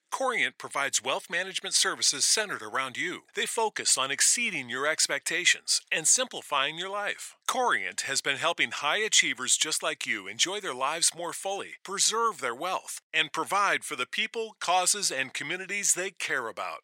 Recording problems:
thin; very; fading below 700 Hz

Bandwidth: 16 kHz